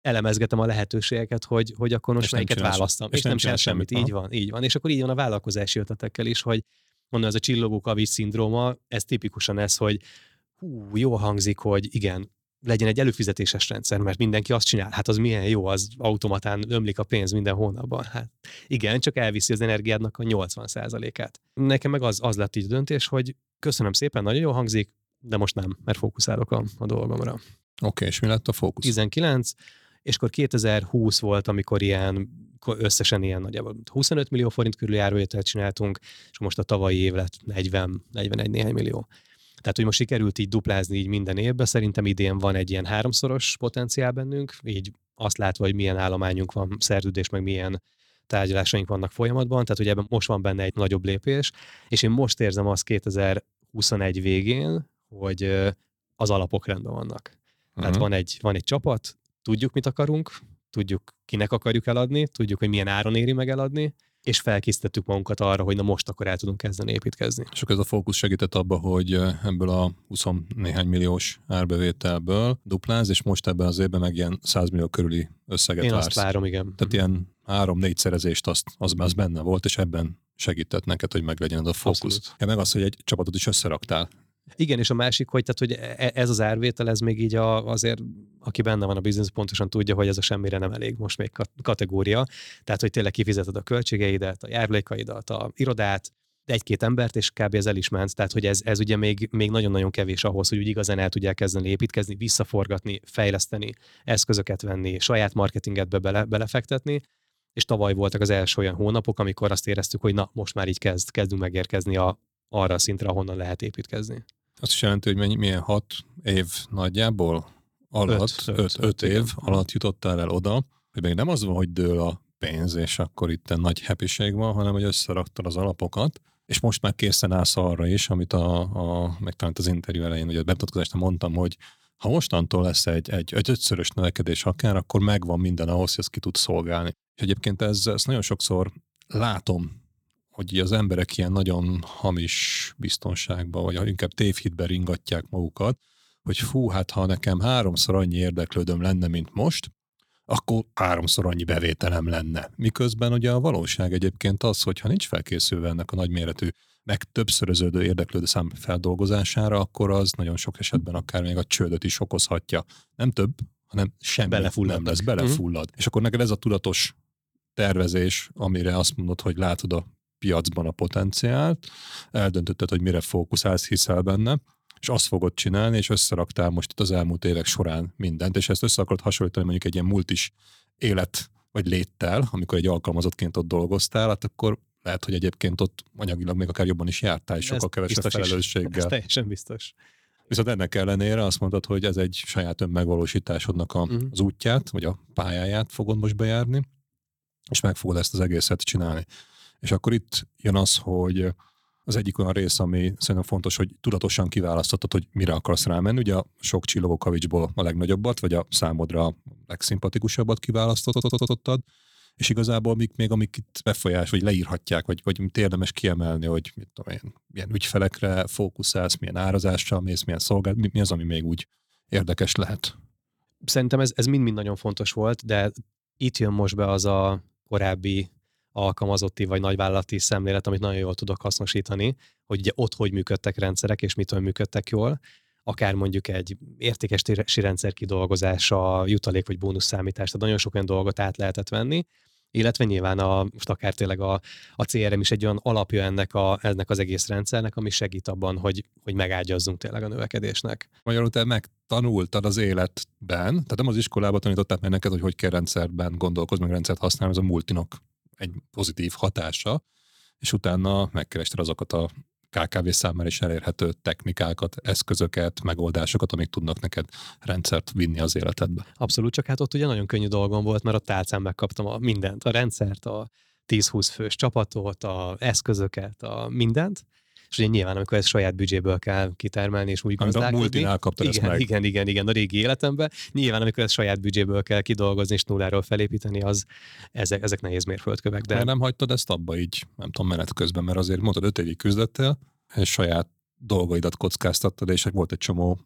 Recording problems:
audio stuttering; at 3:31

